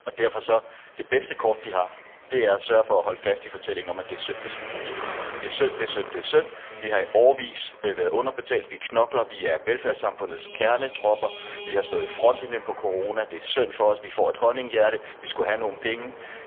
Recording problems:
phone-call audio; poor line; nothing above 3.5 kHz
traffic noise; noticeable; throughout; 15 dB below the speech

